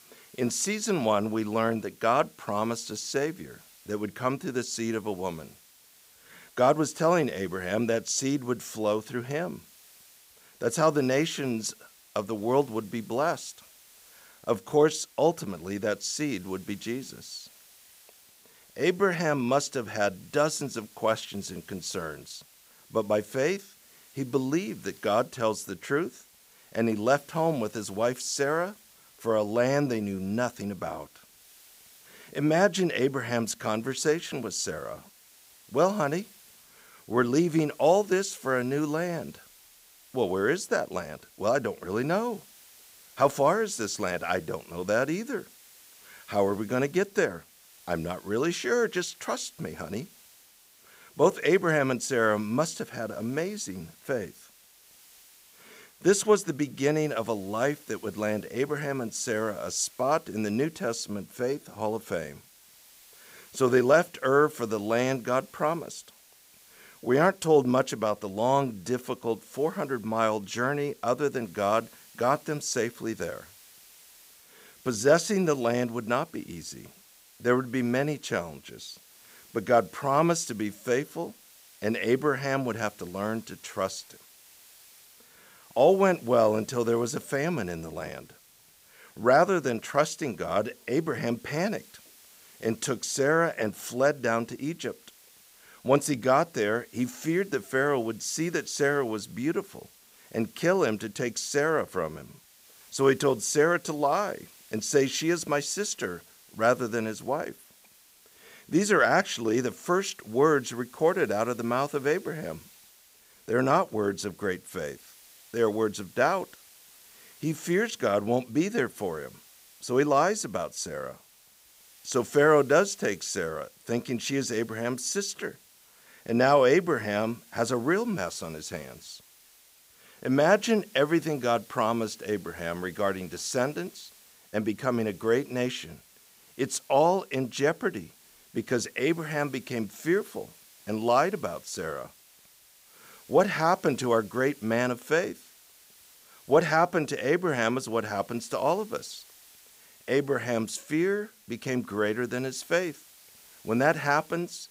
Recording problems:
hiss; faint; throughout; 25 dB below the speech

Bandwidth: 15.5 kHz